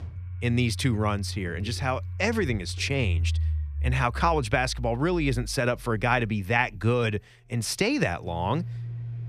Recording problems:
household noises; loud; throughout; 7 dB below the speech

